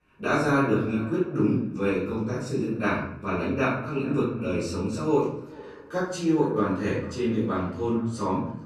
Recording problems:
off-mic speech; far
room echo; noticeable; dies away in 0.6 s
echo of what is said; faint; throughout; 440 ms later, 20 dB below the speech

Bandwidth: 13.5 kHz